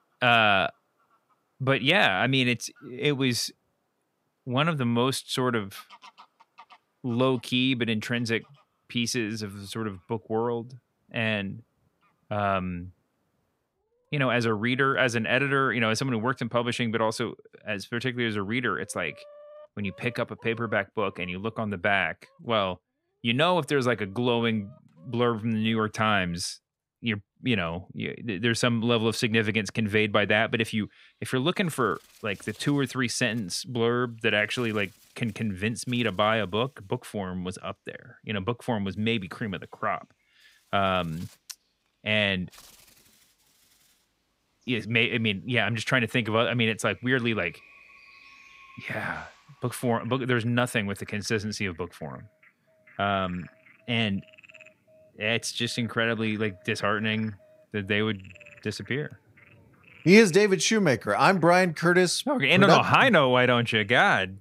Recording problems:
animal sounds; faint; throughout; 30 dB below the speech

